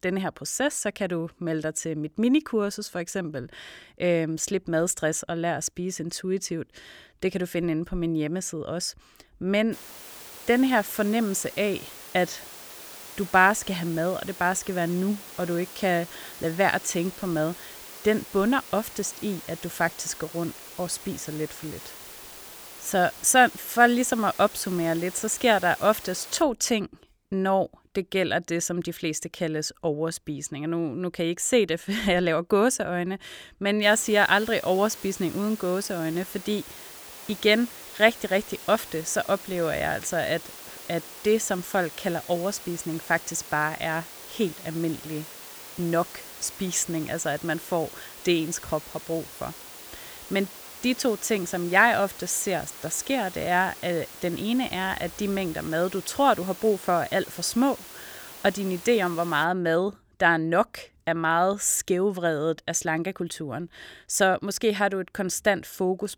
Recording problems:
hiss; noticeable; from 9.5 to 26 s and from 34 to 59 s; 15 dB below the speech

